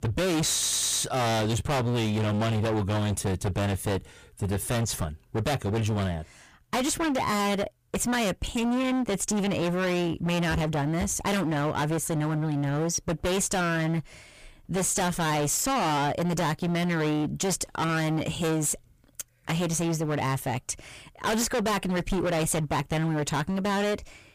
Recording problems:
distortion; heavy; 33% of the sound clipped
audio stuttering; at 0.5 s

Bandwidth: 15 kHz